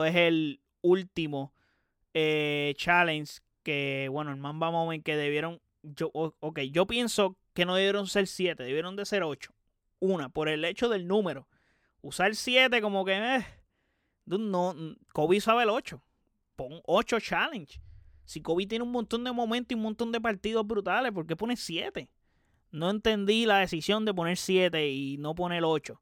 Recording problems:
abrupt cut into speech; at the start

